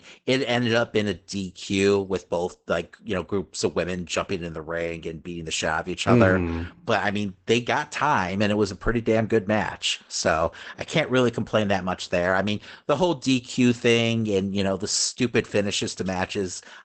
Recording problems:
garbled, watery; badly; nothing above 8 kHz

